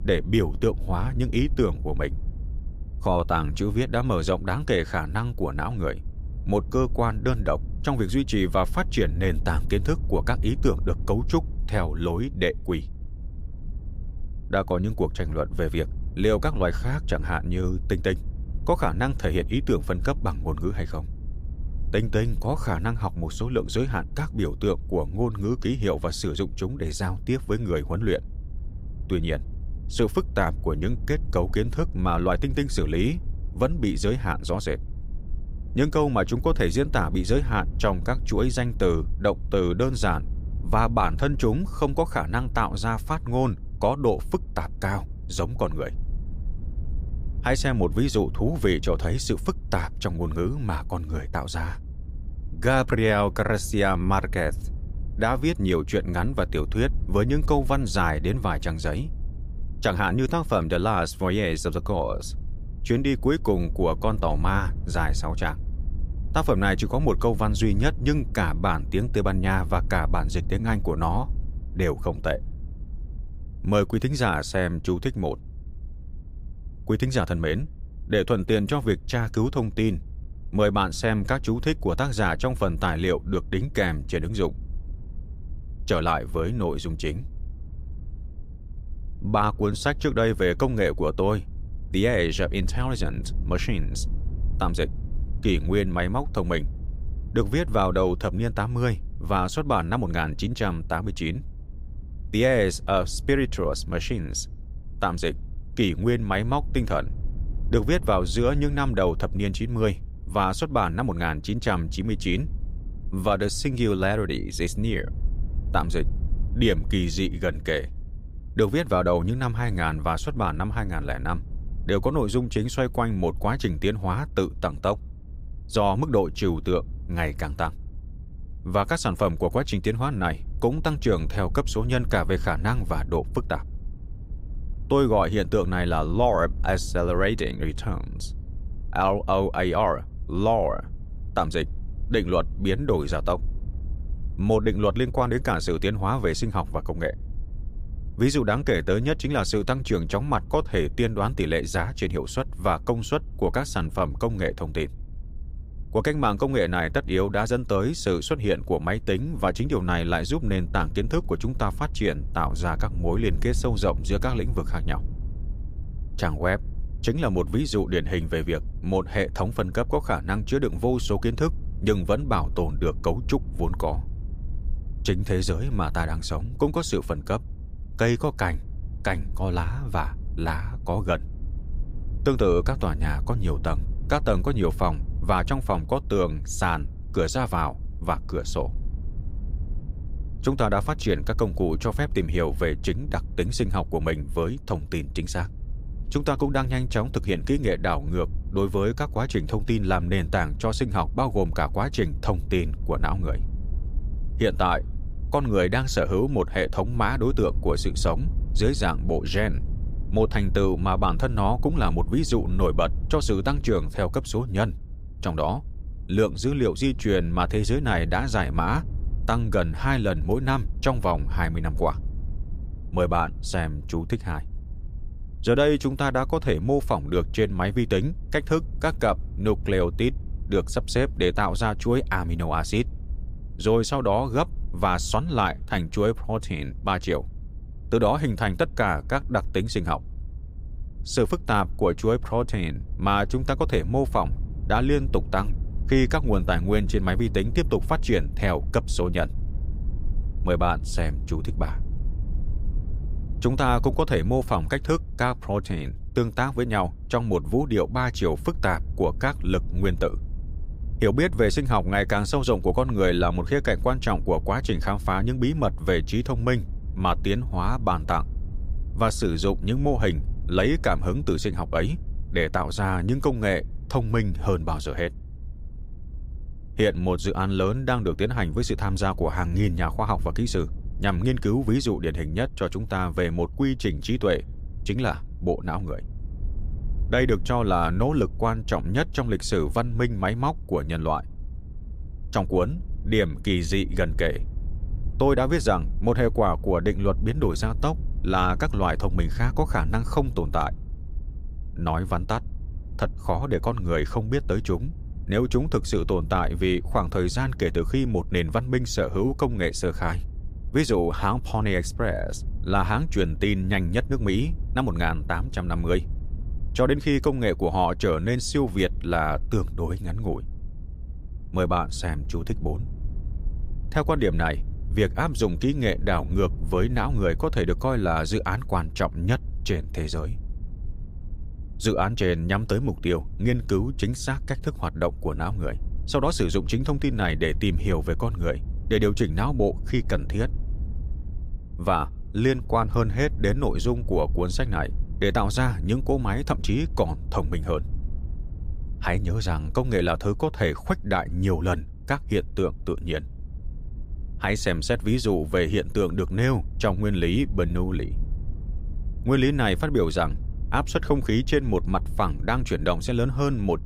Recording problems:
low rumble; faint; throughout; 25 dB below the speech

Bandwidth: 15.5 kHz